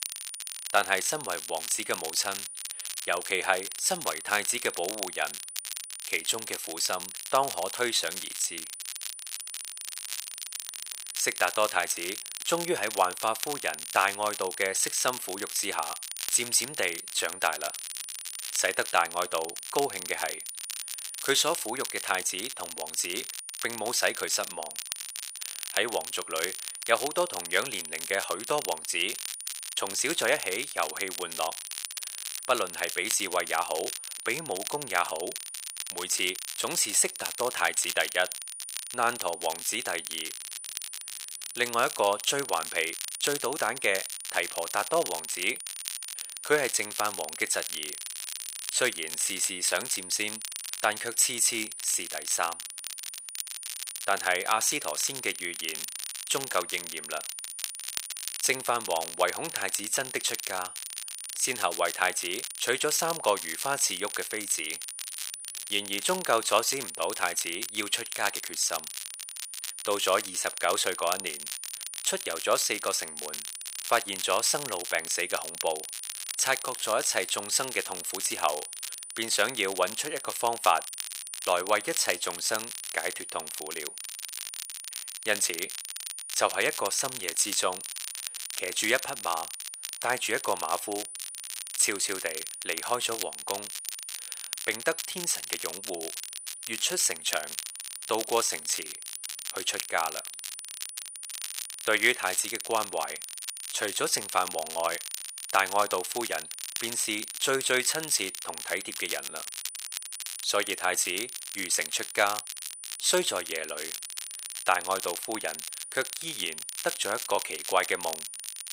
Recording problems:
thin; very; fading below 700 Hz
crackle, like an old record; loud; 8 dB below the speech
high-pitched whine; noticeable; throughout; 9.5 kHz, 10 dB below the speech

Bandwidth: 15.5 kHz